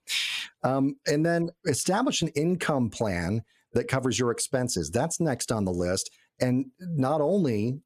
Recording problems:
squashed, flat; heavily

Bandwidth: 14.5 kHz